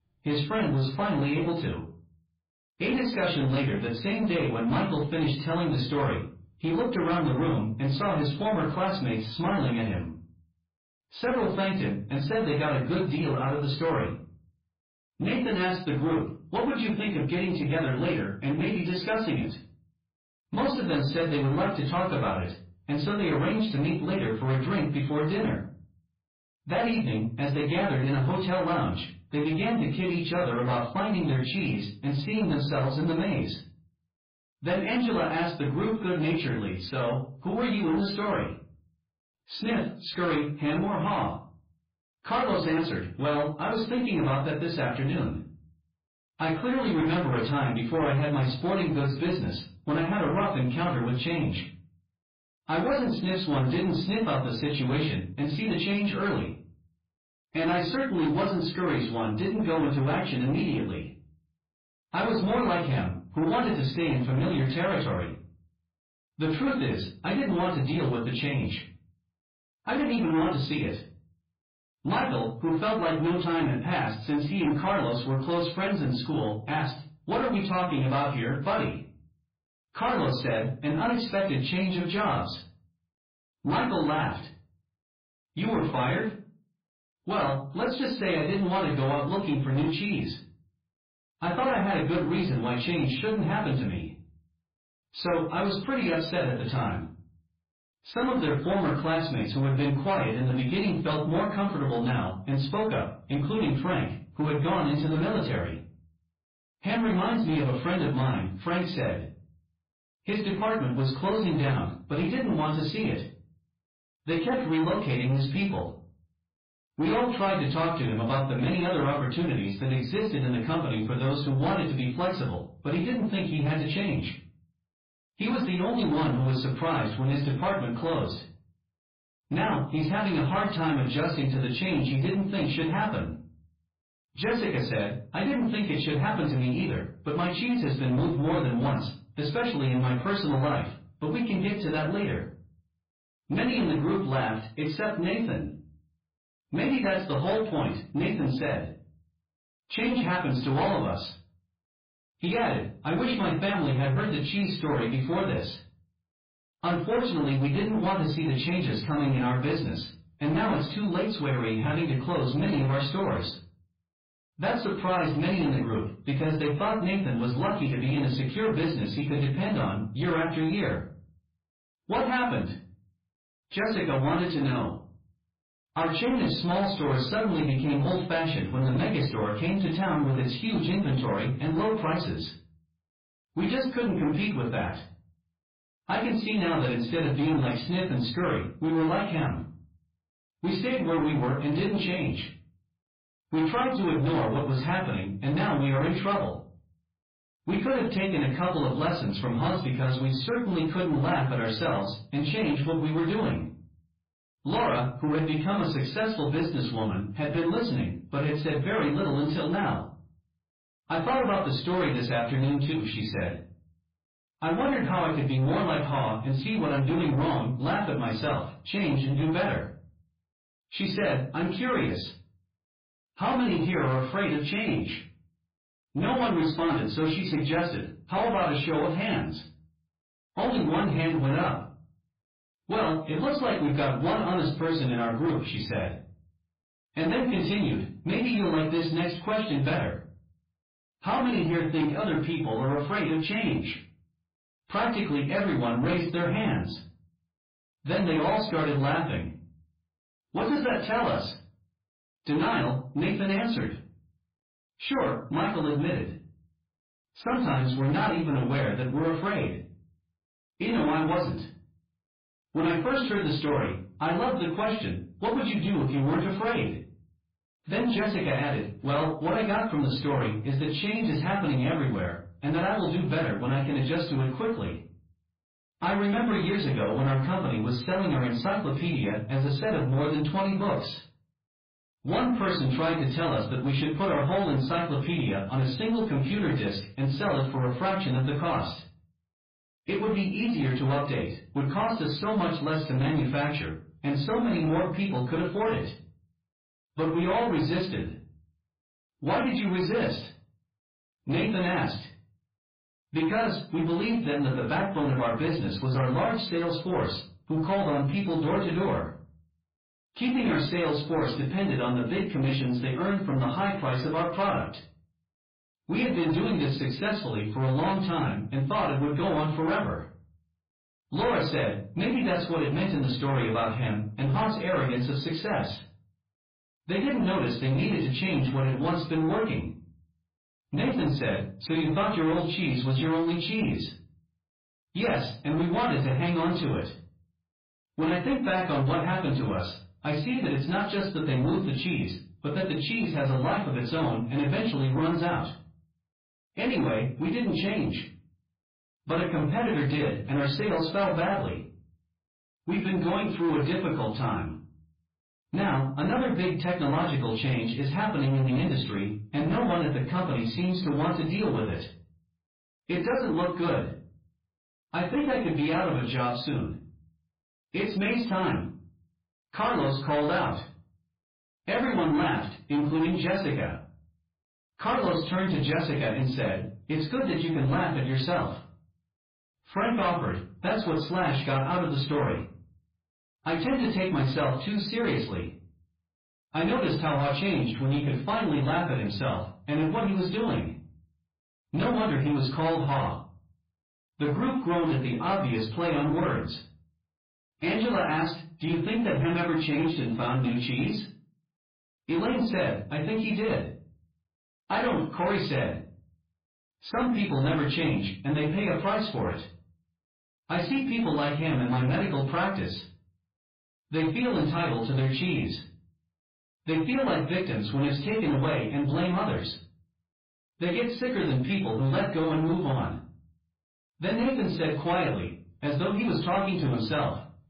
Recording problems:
off-mic speech; far
garbled, watery; badly; nothing above 4.5 kHz
room echo; slight; dies away in 0.4 s
distortion; slight; 10 dB below the speech

